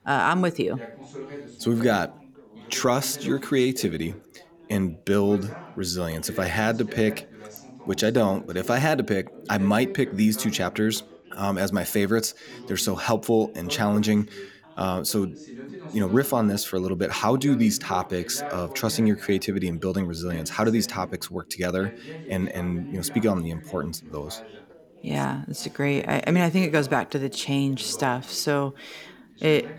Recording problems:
background chatter; noticeable; throughout; 3 voices, 15 dB below the speech

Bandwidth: 18 kHz